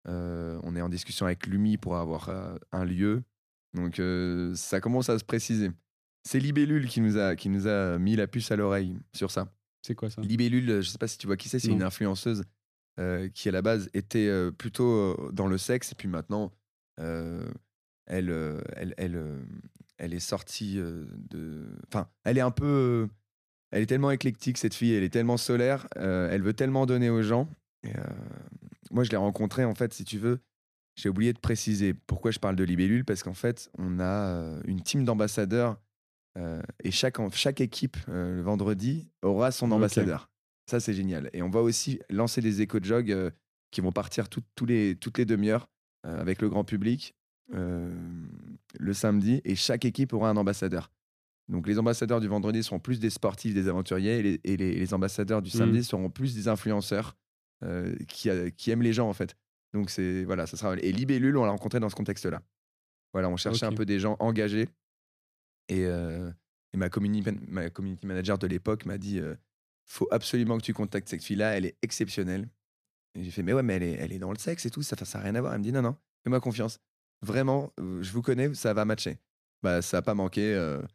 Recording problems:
none

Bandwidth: 14.5 kHz